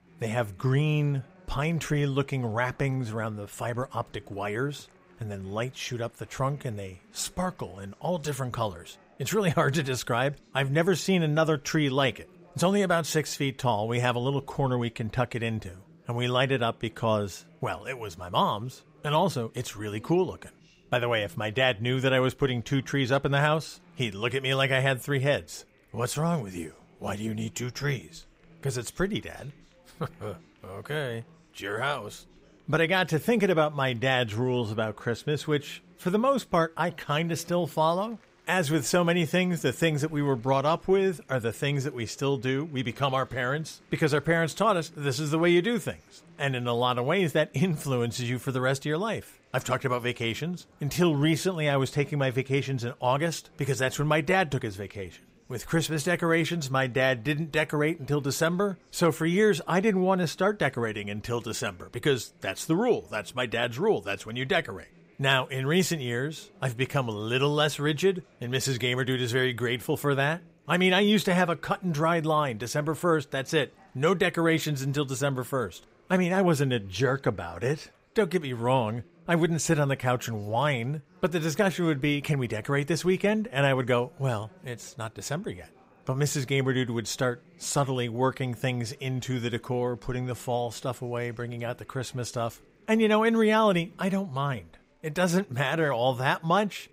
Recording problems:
chatter from many people; faint; throughout; 30 dB below the speech

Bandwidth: 15.5 kHz